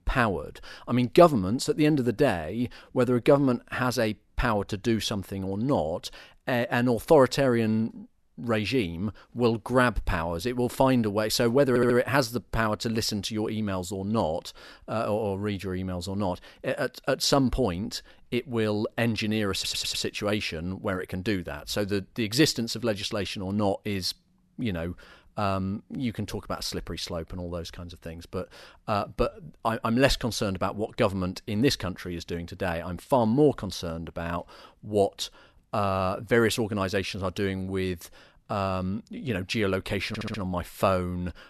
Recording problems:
audio stuttering; at 12 s, at 20 s and at 40 s

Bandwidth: 13.5 kHz